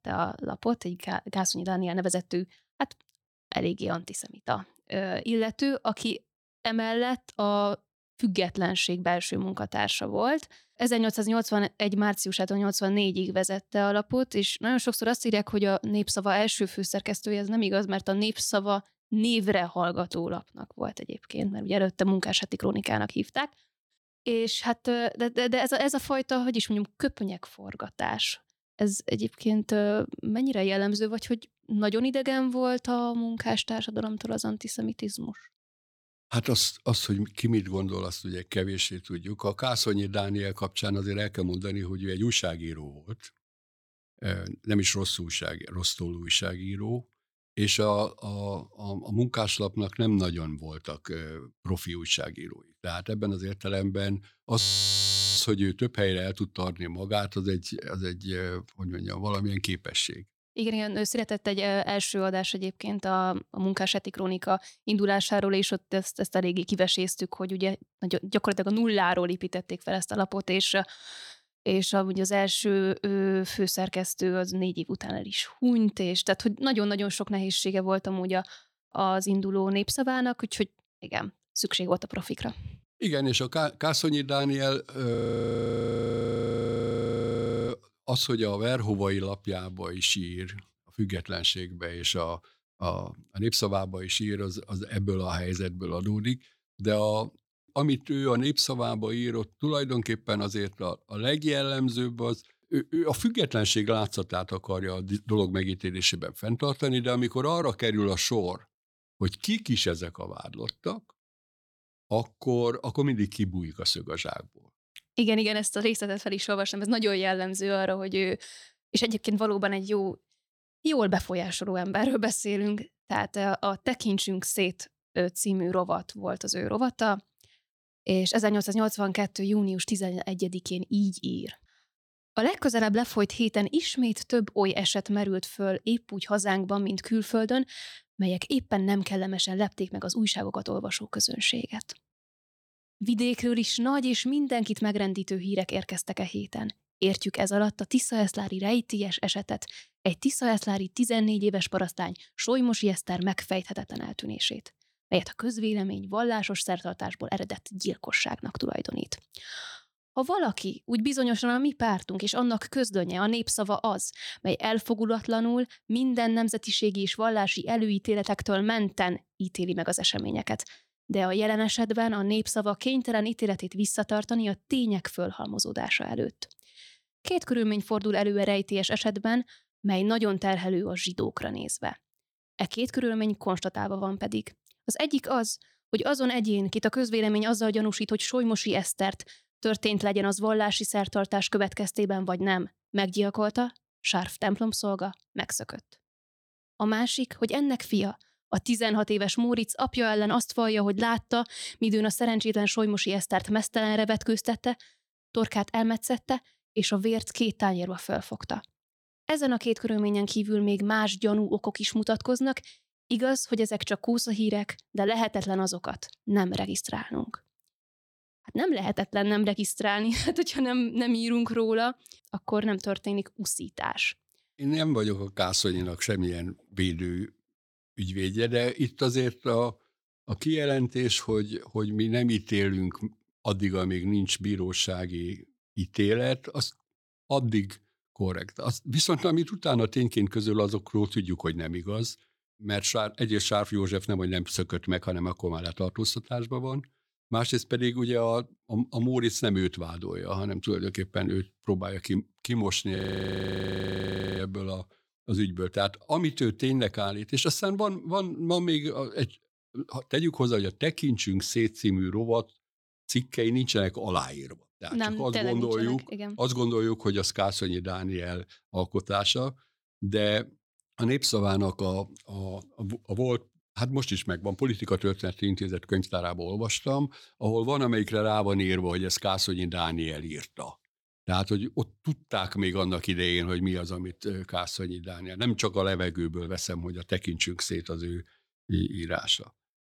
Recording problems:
audio freezing; at 55 s for 1 s, at 1:25 for 2.5 s and at 4:13 for 1.5 s

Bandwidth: 18.5 kHz